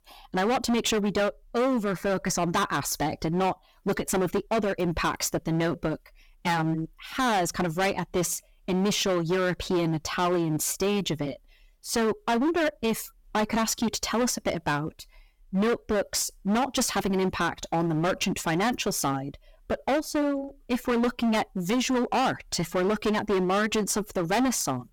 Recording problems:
distortion; heavy; 17% of the sound clipped

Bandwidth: 17 kHz